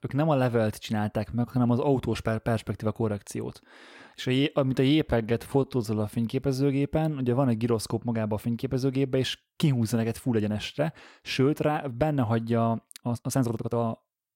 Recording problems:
uneven, jittery; strongly; from 1.5 to 14 s

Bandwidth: 16 kHz